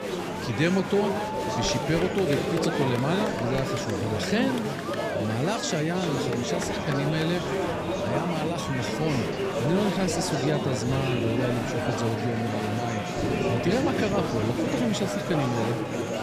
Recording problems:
murmuring crowd; loud; throughout; as loud as the speech

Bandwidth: 15 kHz